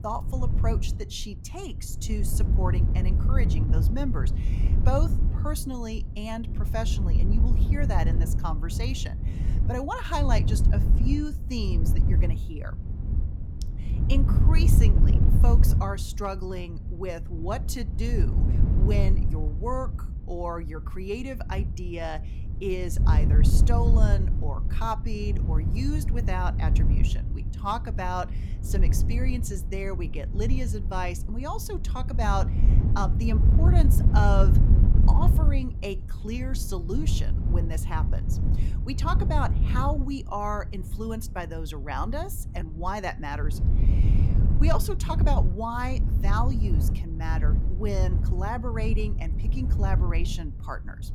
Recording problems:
wind noise on the microphone; heavy; 7 dB below the speech

